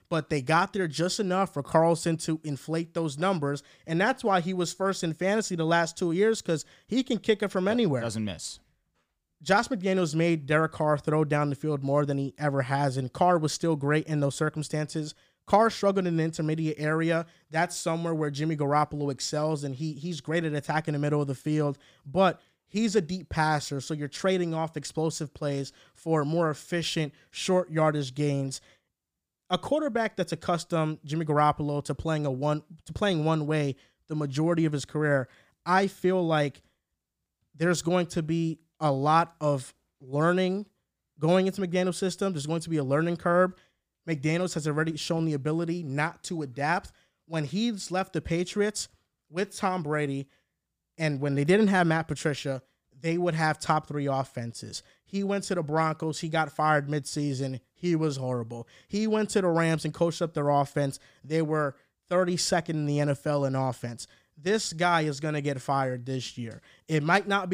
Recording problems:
abrupt cut into speech; at the end

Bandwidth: 15 kHz